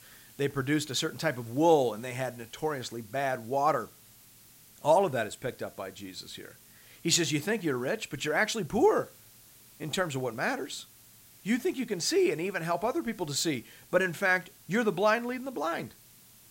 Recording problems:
hiss; faint; throughout; 25 dB below the speech

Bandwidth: 16 kHz